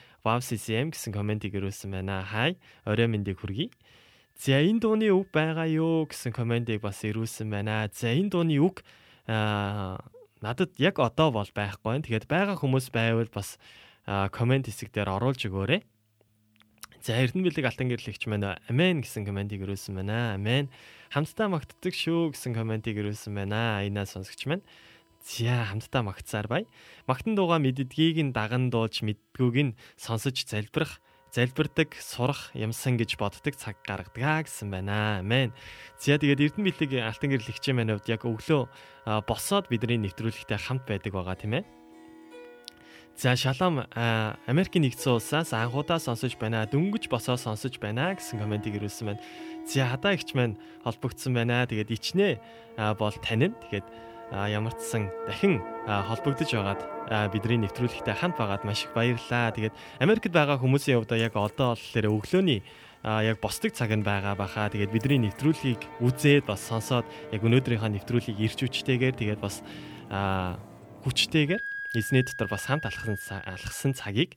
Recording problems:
background music; noticeable; throughout; 15 dB below the speech

